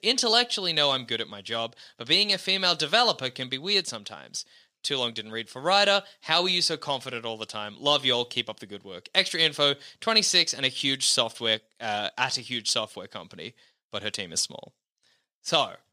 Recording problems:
thin; very slightly; fading below 1 kHz

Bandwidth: 15 kHz